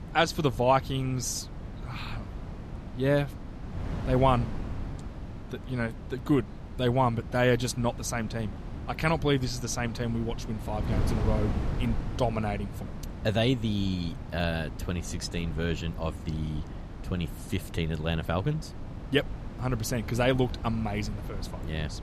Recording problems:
wind noise on the microphone; occasional gusts; 15 dB below the speech

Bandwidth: 14 kHz